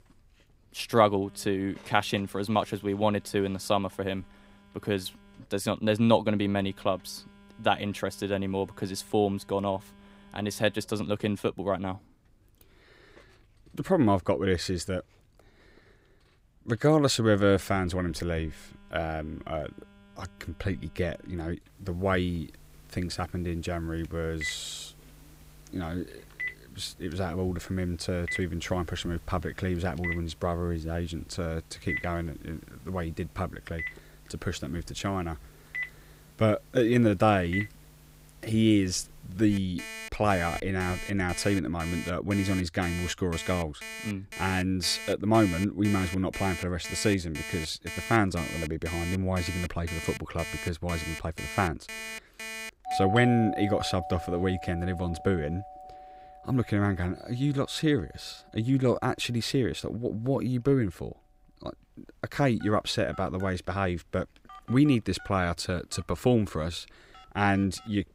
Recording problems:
alarms or sirens; loud; throughout; 9 dB below the speech

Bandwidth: 15.5 kHz